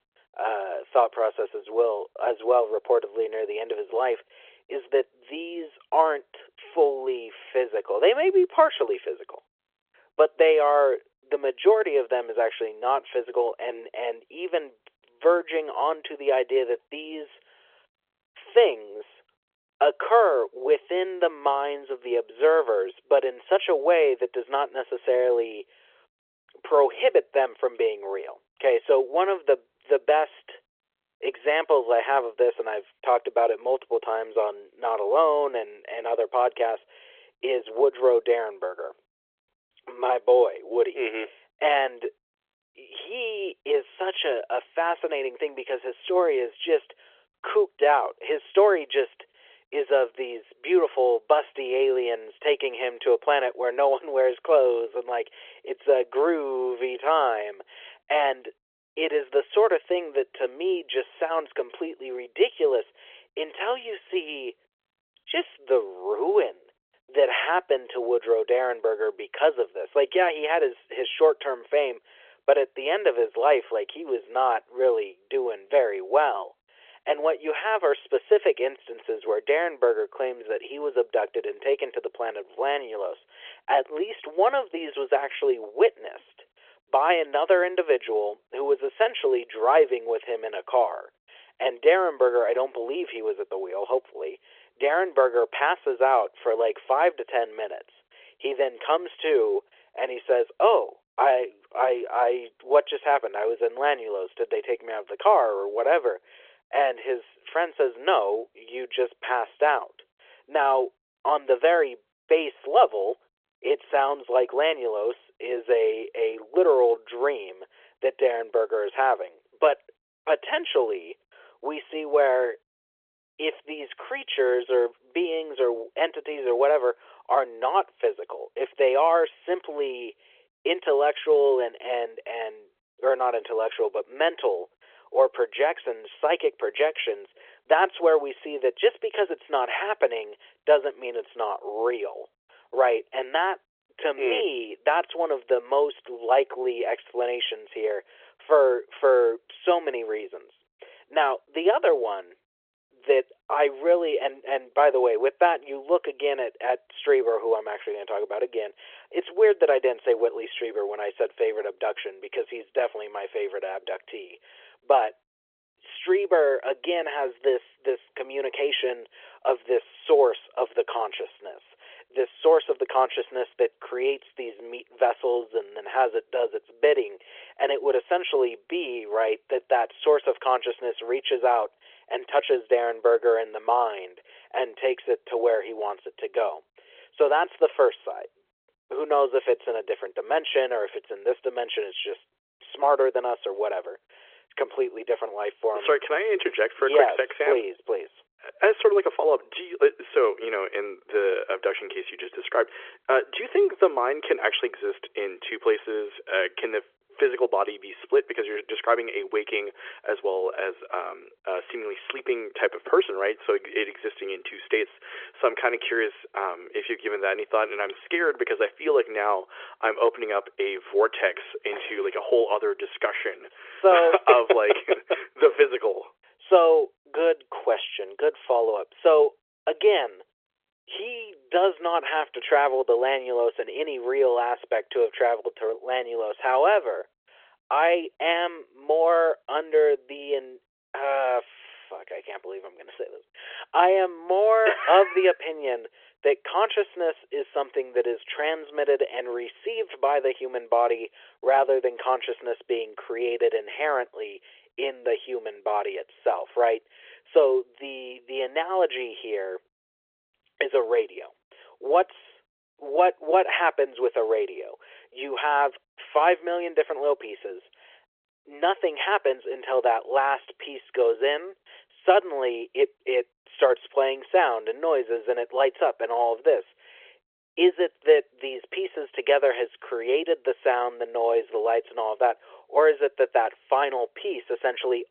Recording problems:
phone-call audio; nothing above 3.5 kHz

